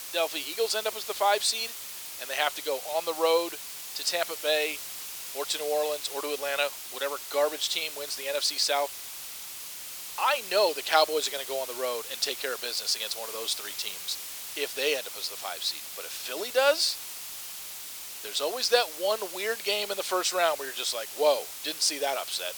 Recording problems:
thin; very; fading below 450 Hz
hiss; loud; throughout; 8 dB below the speech

